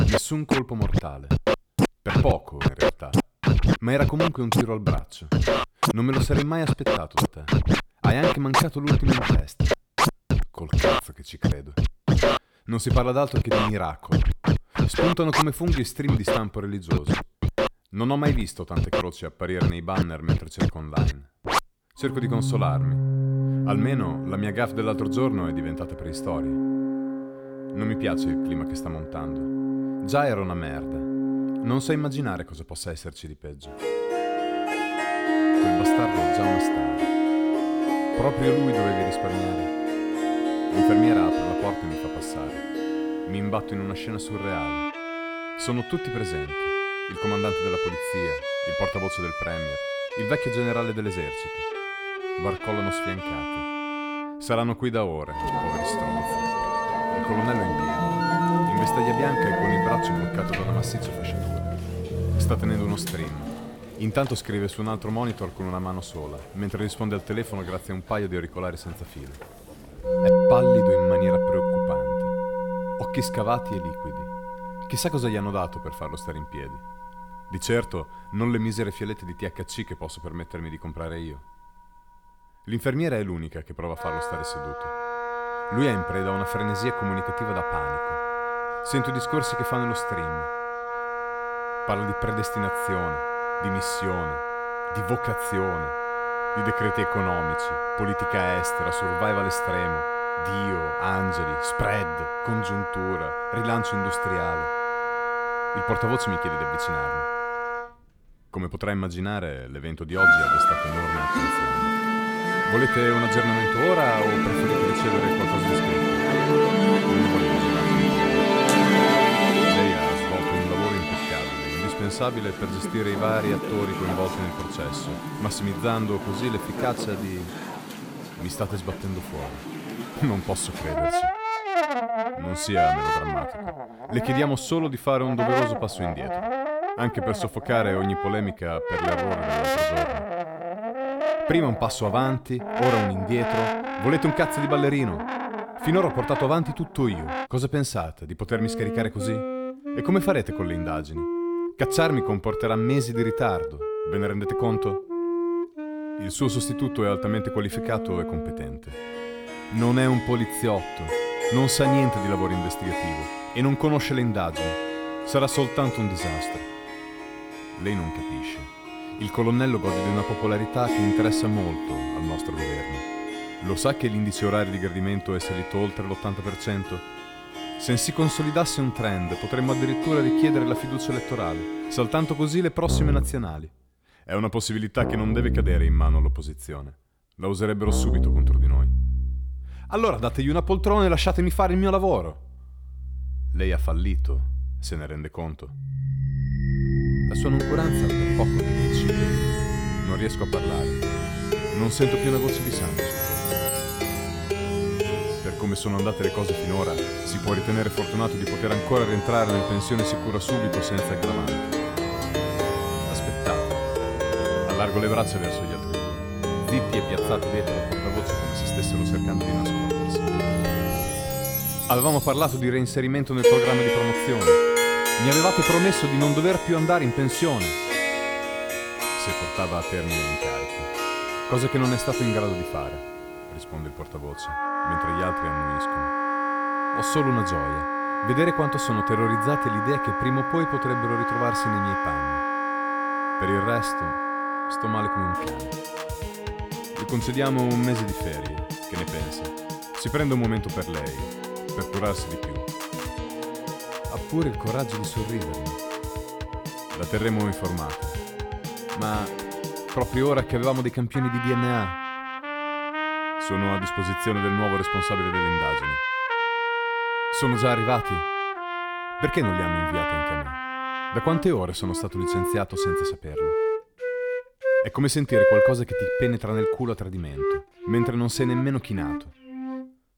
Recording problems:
background music; very loud; throughout; 1 dB above the speech

